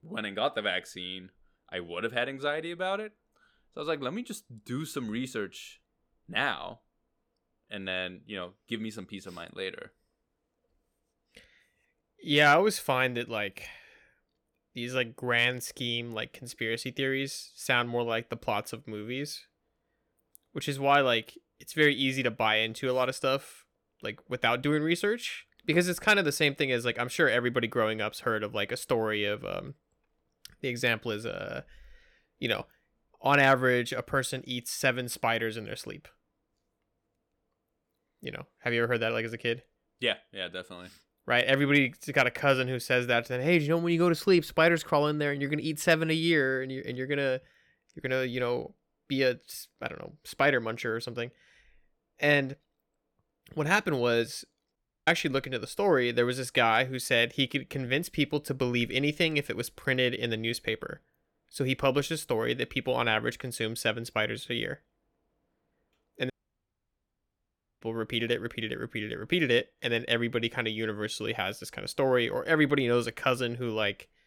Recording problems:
audio cutting out; at 55 s and at 1:06 for 1.5 s

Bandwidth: 17.5 kHz